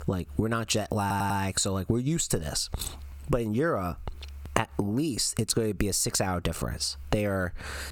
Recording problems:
squashed, flat; heavily
audio stuttering; at 1 s

